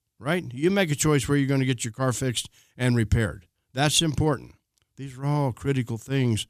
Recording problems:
none

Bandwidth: 14.5 kHz